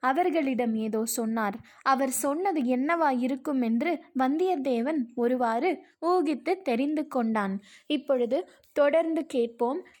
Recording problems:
none

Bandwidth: 19 kHz